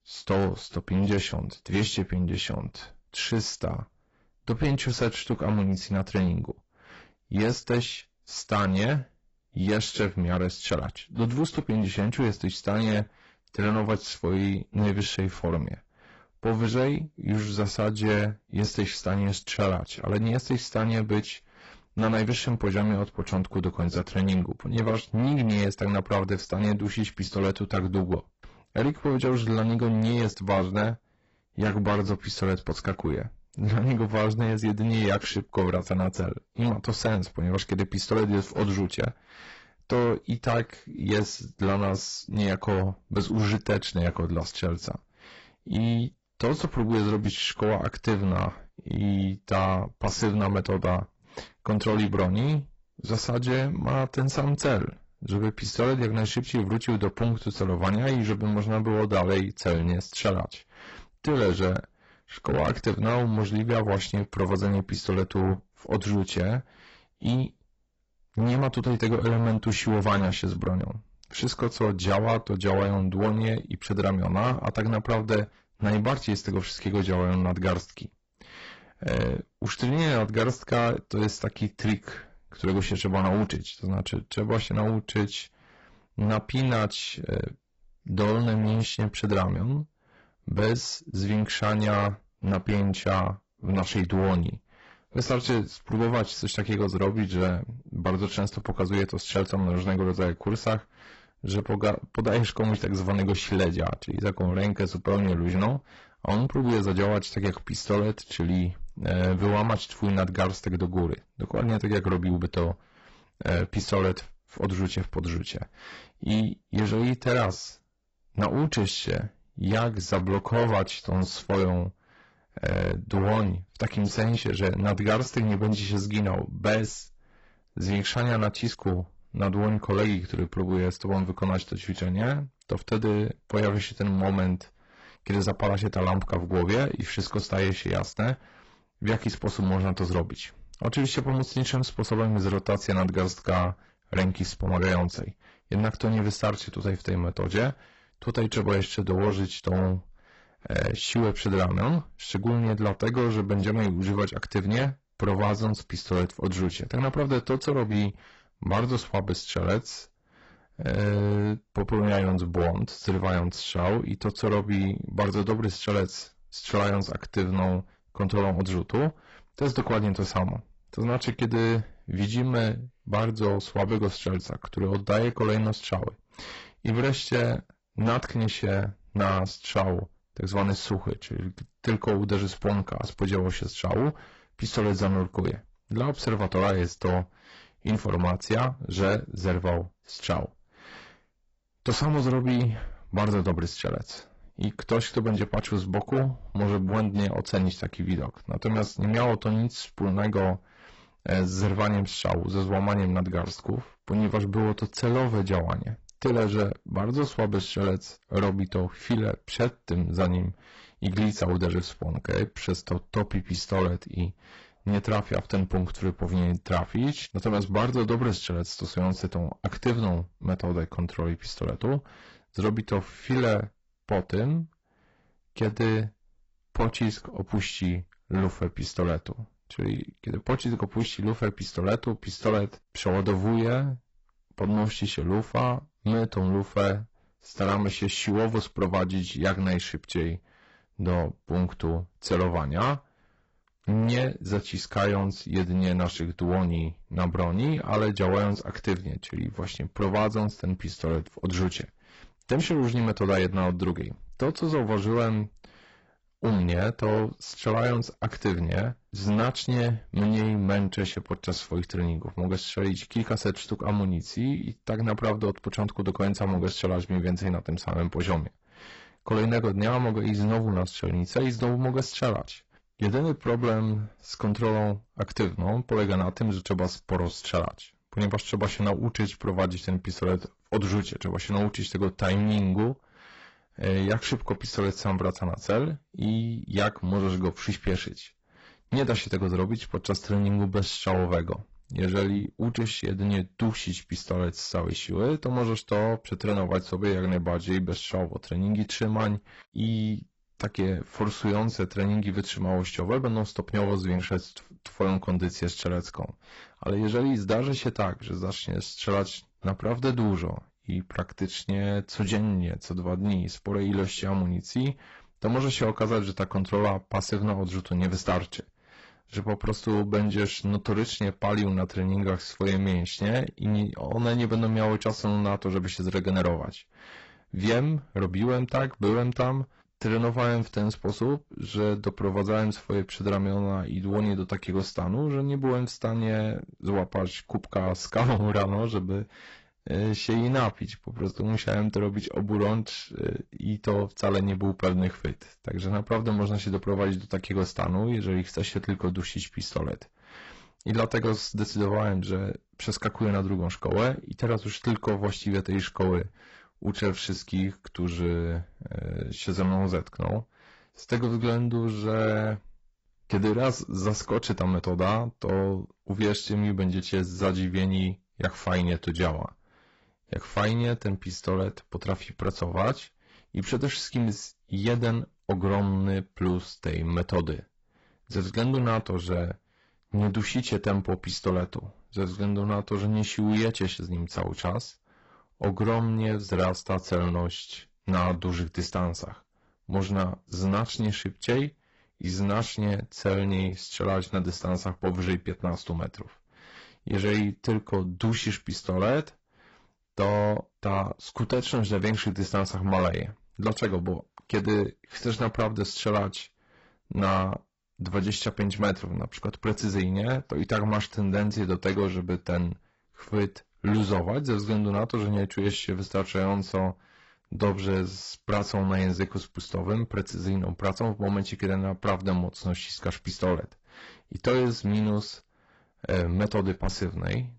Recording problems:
garbled, watery; badly; nothing above 8 kHz
distortion; slight; 10 dB below the speech

